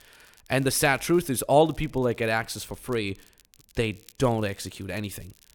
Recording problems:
crackle, like an old record; faint; 30 dB below the speech

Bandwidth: 17 kHz